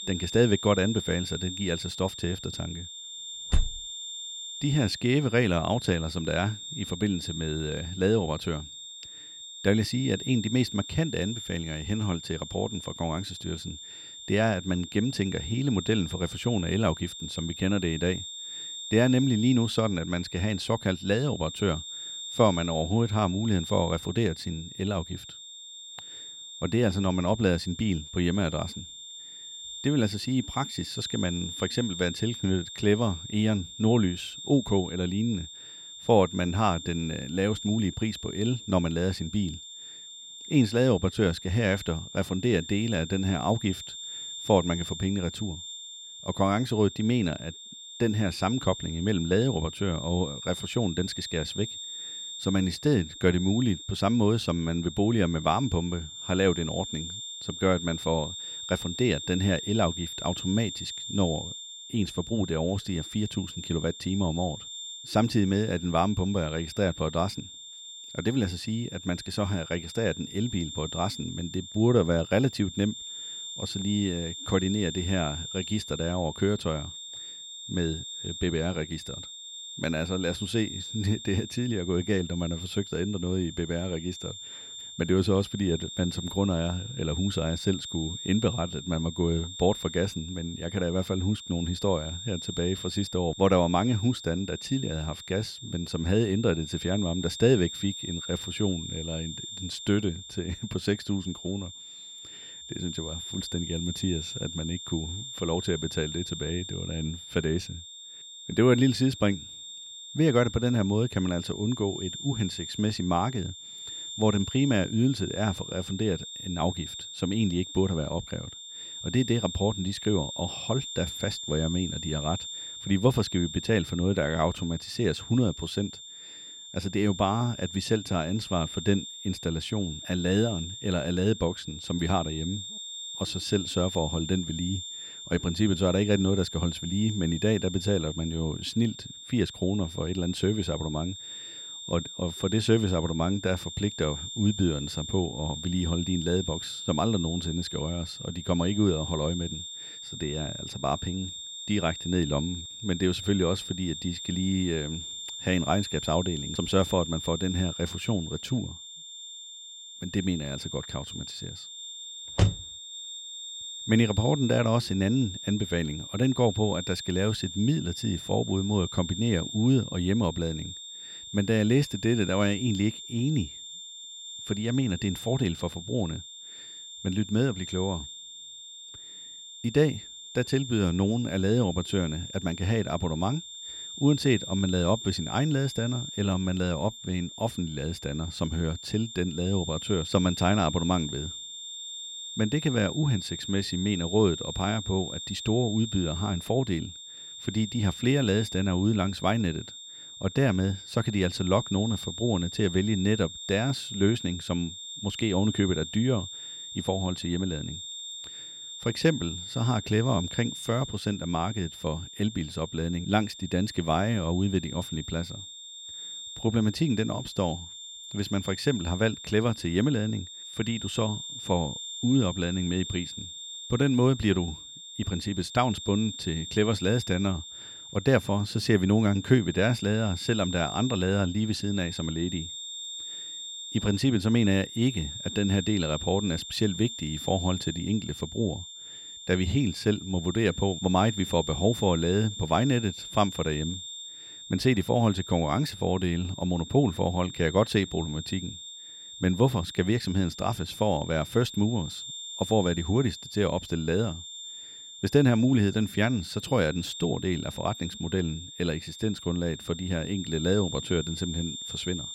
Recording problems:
high-pitched whine; loud; throughout; 3.5 kHz, 10 dB below the speech

